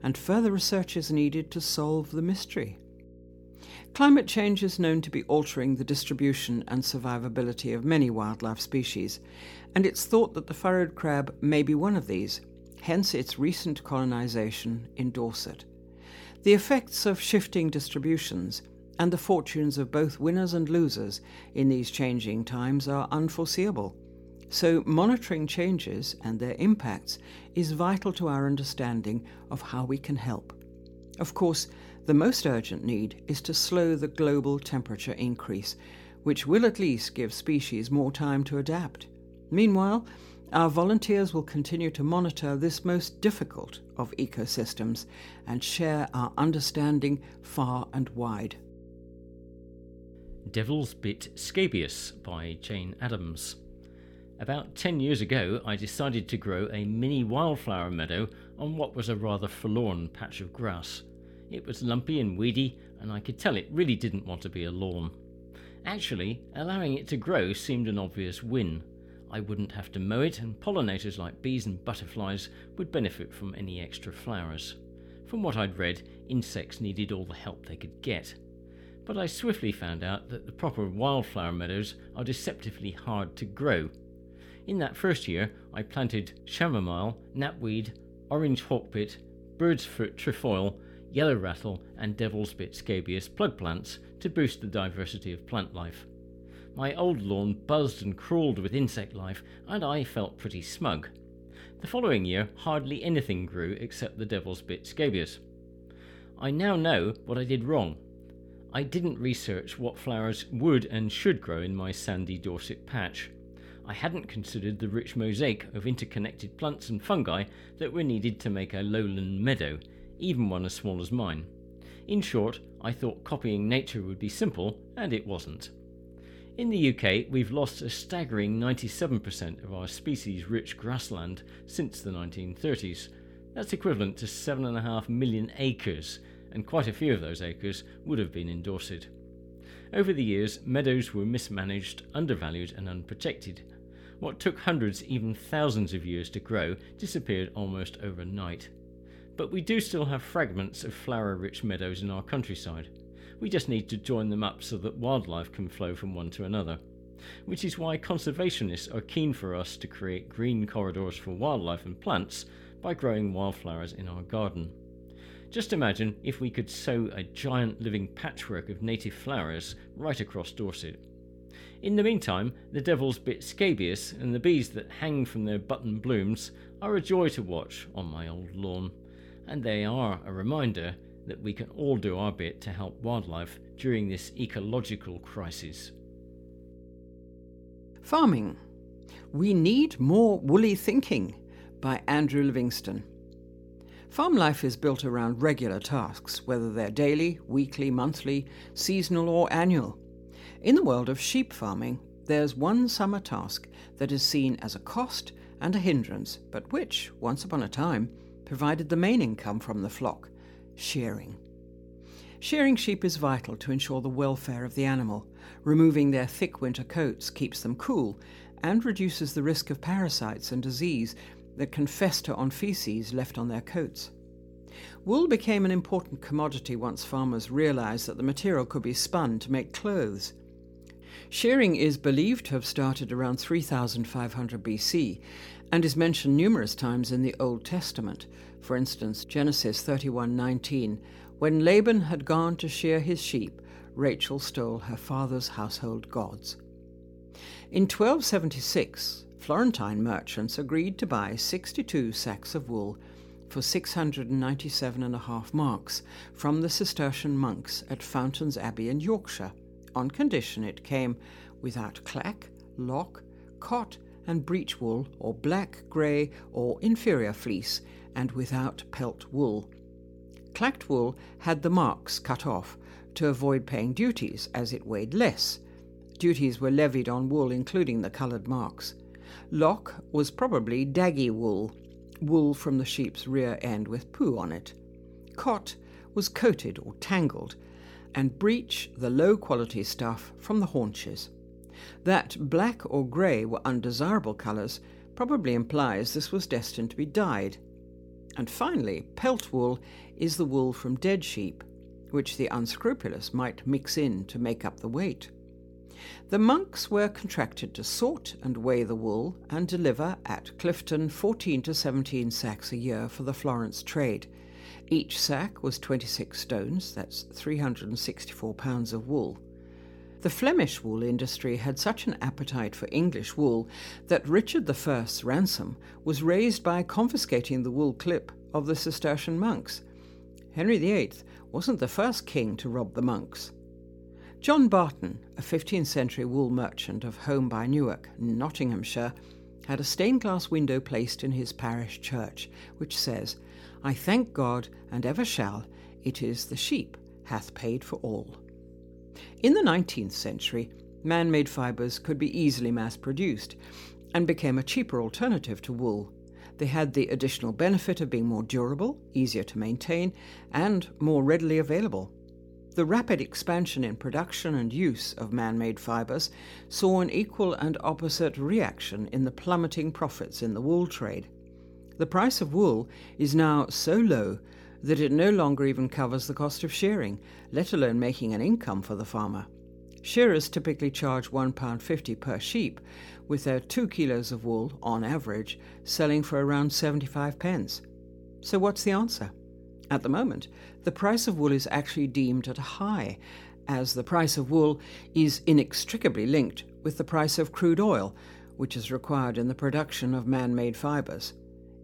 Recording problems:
electrical hum; faint; throughout; 60 Hz, 25 dB below the speech

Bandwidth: 17.5 kHz